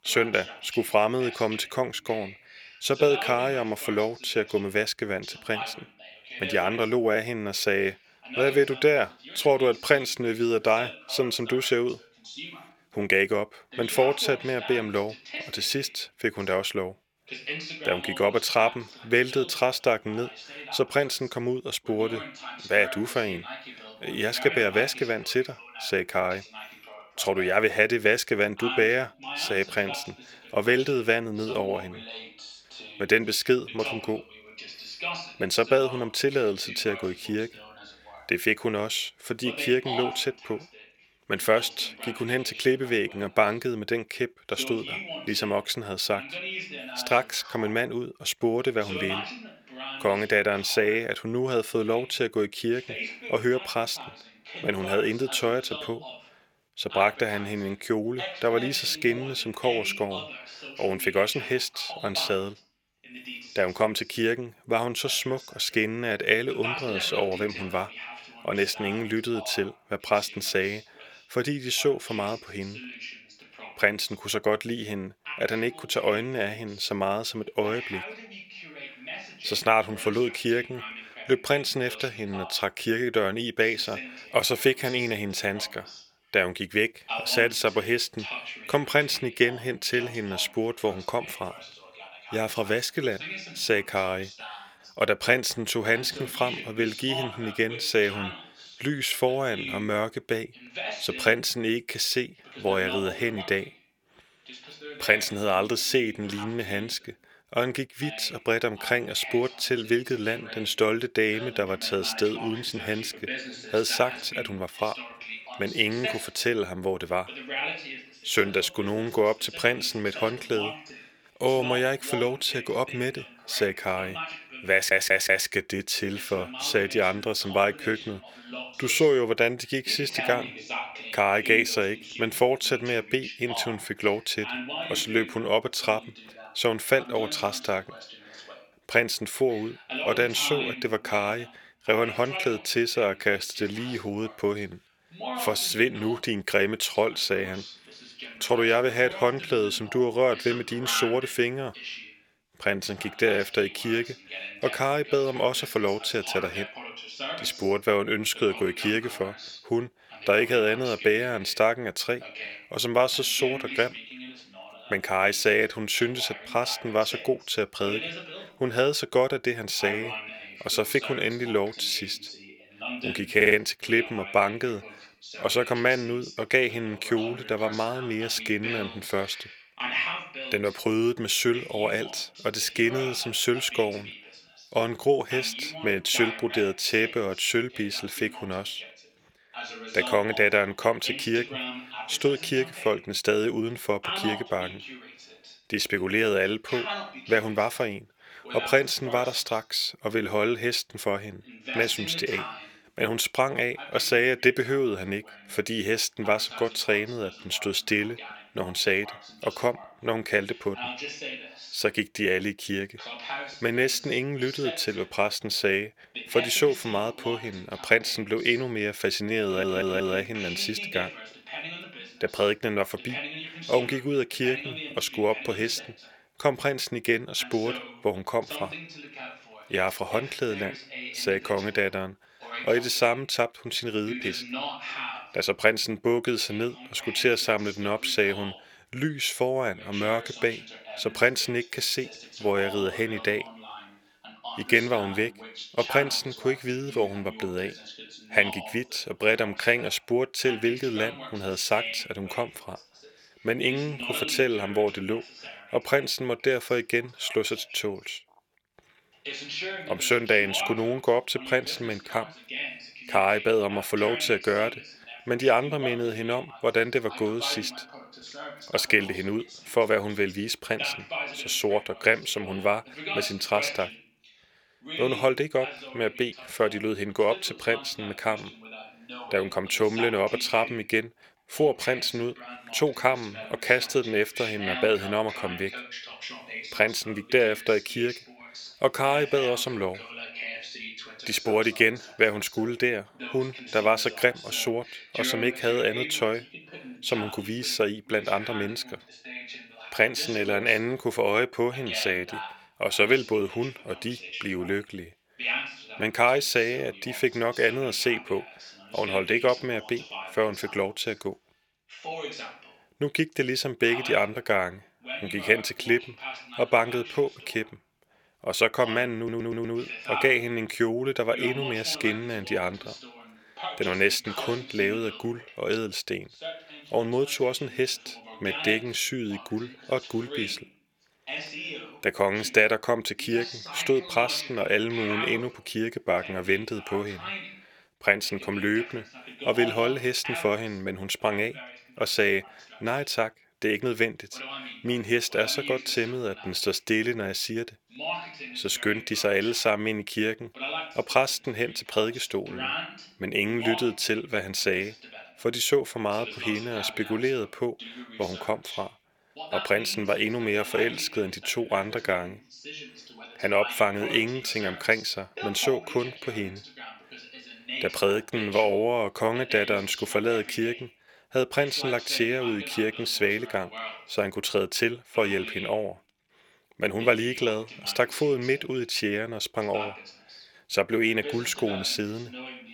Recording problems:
thin; very slightly; fading below 450 Hz
voice in the background; noticeable; throughout; 10 dB below the speech
audio stuttering; 4 times, first at 2:05

